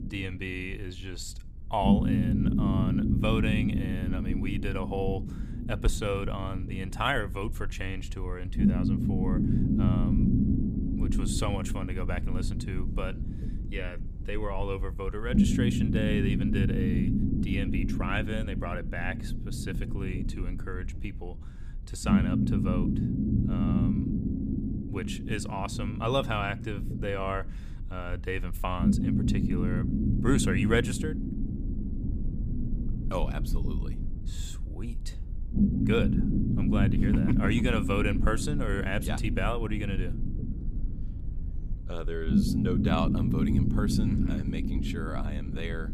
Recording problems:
low rumble; loud; throughout; 2 dB below the speech

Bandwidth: 15 kHz